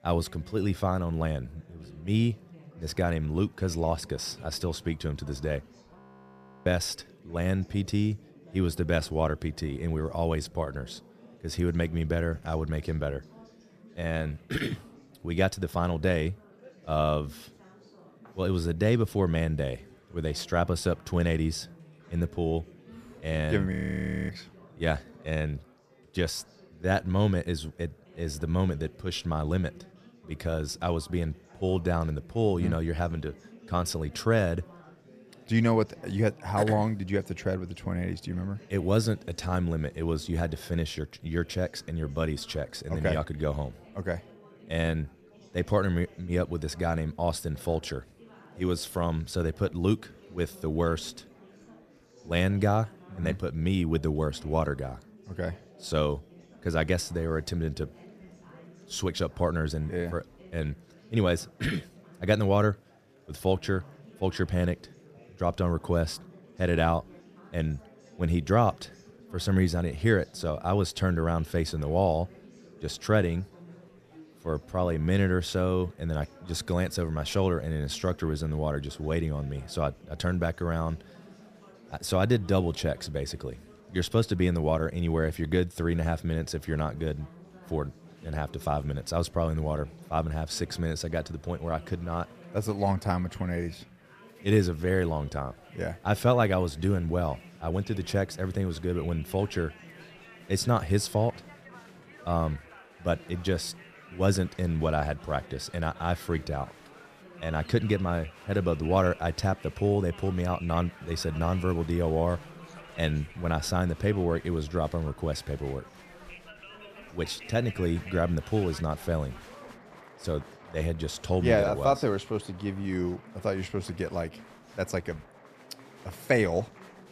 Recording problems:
chatter from many people; faint; throughout; 20 dB below the speech
audio freezing; at 6 s for 0.5 s and at 24 s for 0.5 s

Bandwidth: 14.5 kHz